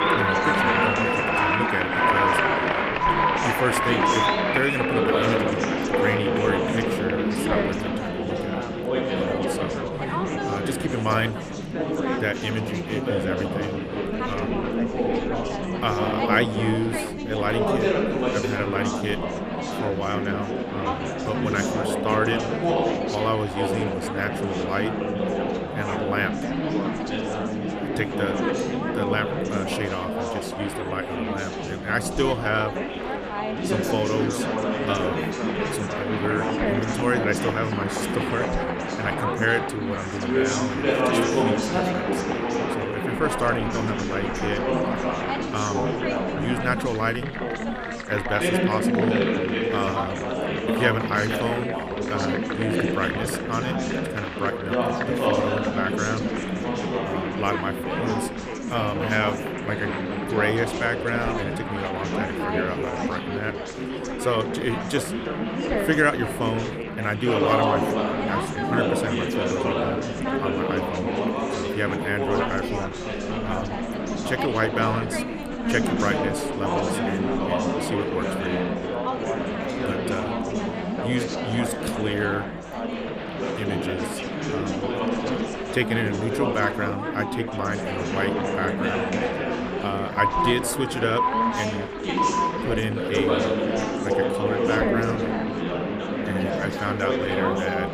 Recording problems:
chatter from many people; very loud; throughout; 3 dB above the speech

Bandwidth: 14.5 kHz